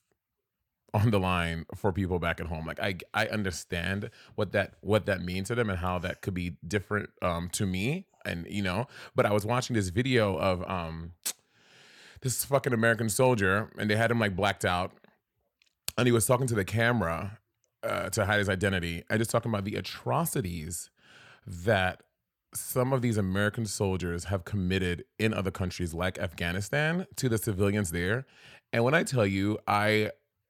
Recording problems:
none

